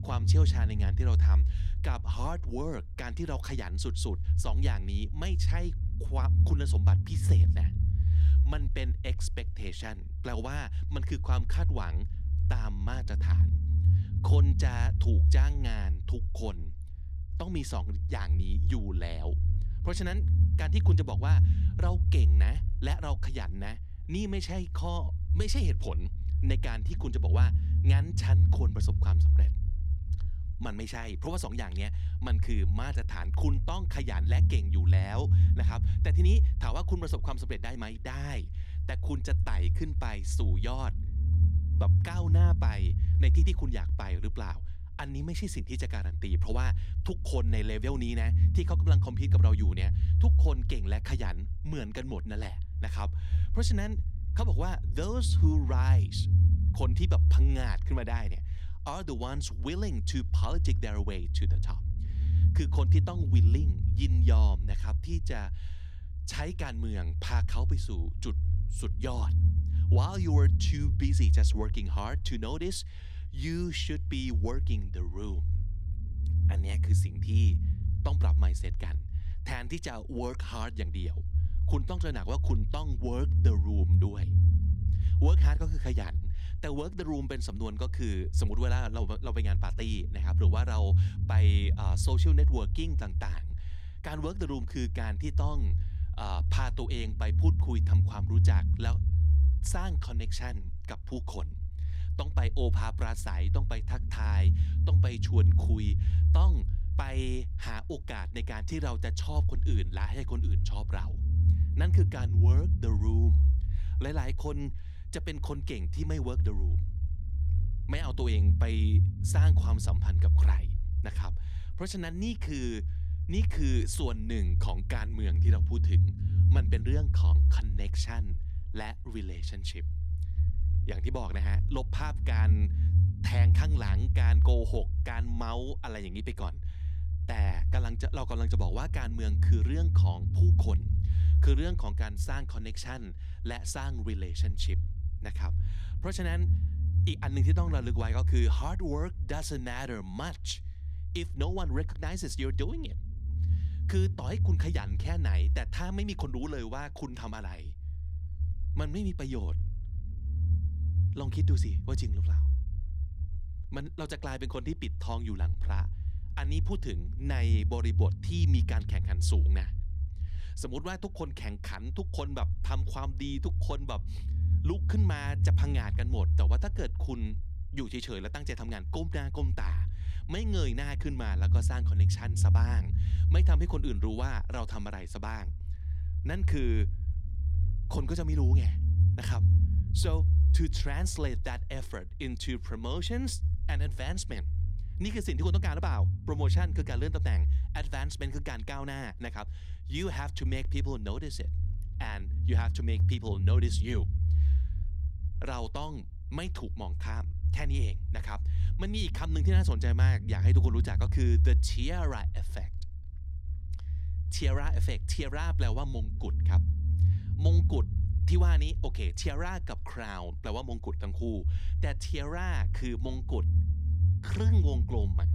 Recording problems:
low rumble; loud; throughout; 6 dB below the speech

